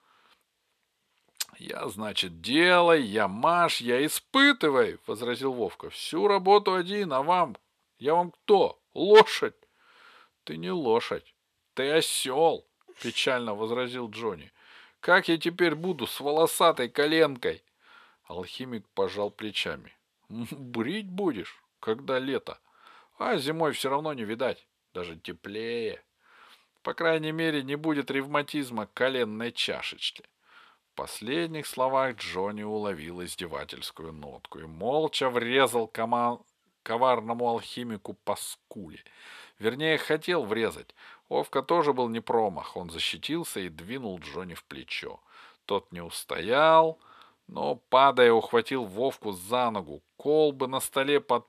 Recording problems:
thin; very slightly; fading below 1 kHz

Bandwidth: 14 kHz